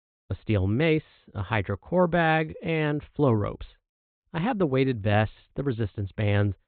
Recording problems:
high frequencies cut off; severe; nothing above 4 kHz

